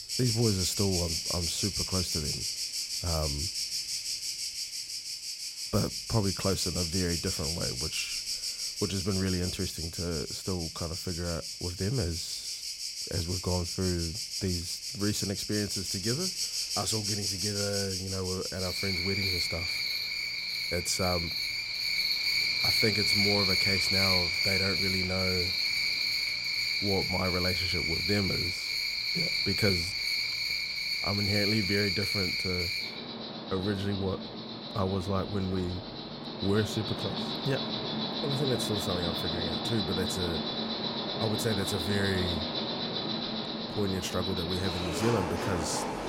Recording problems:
animal sounds; very loud; throughout; 3 dB above the speech

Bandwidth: 16 kHz